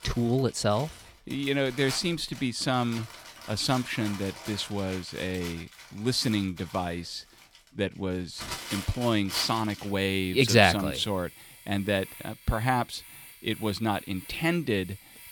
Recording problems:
household noises; noticeable; throughout; 15 dB below the speech

